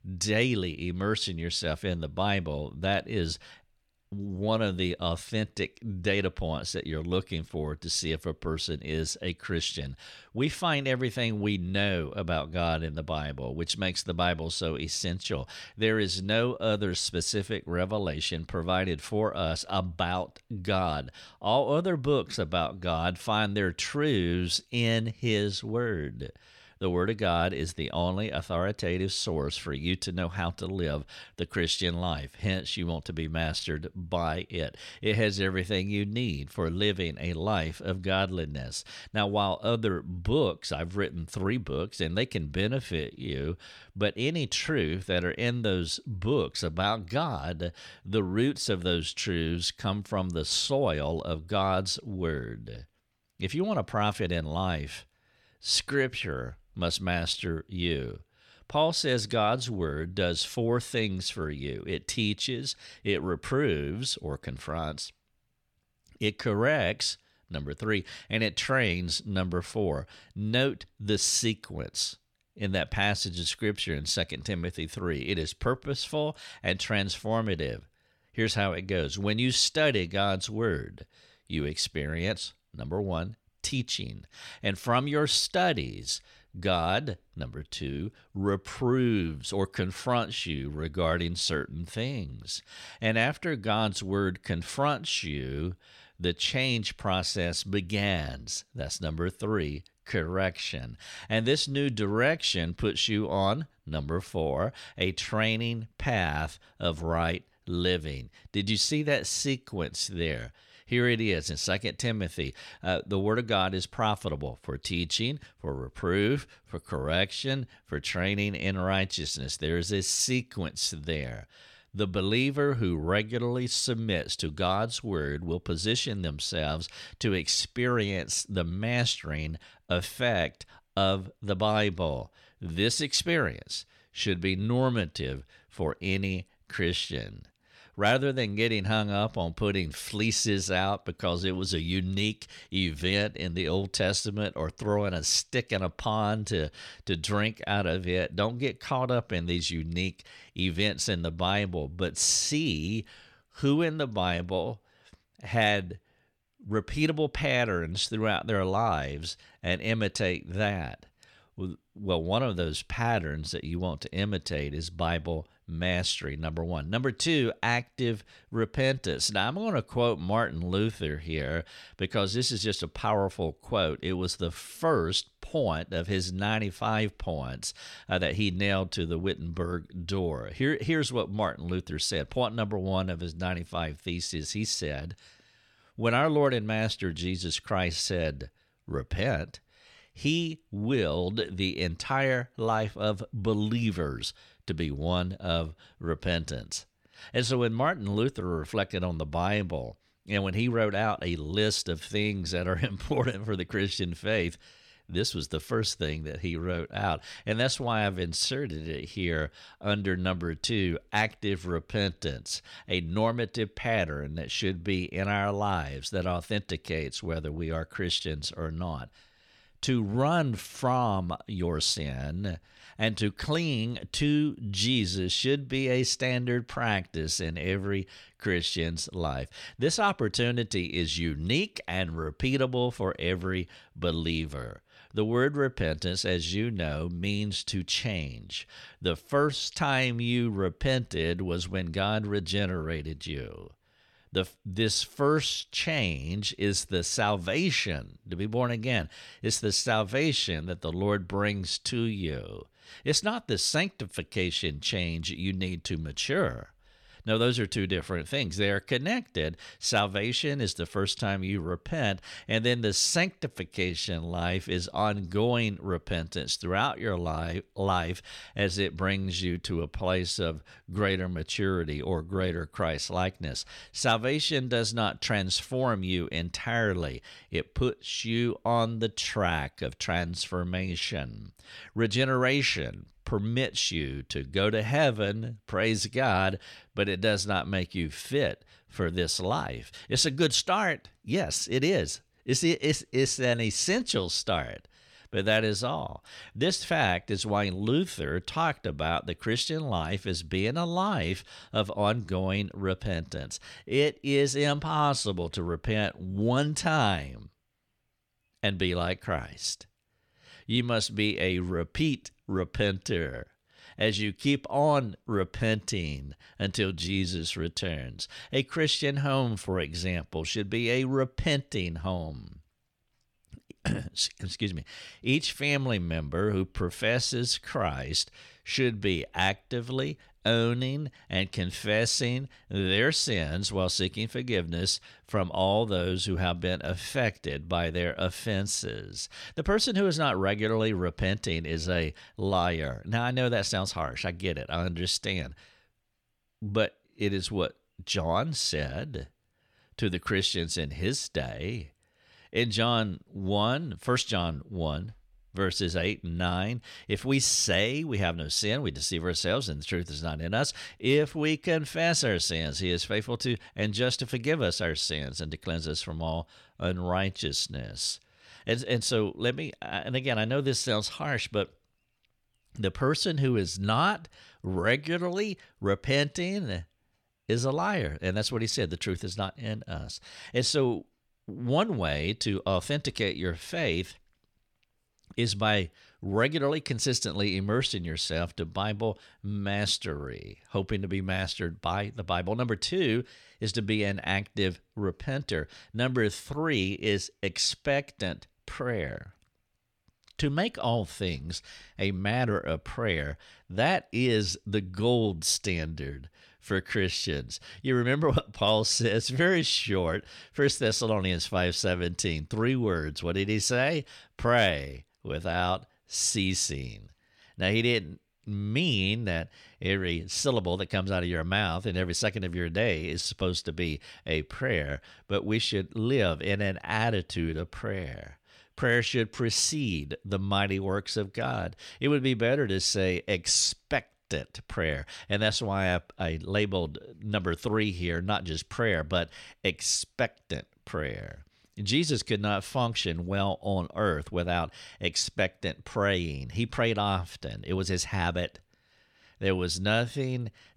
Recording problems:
none

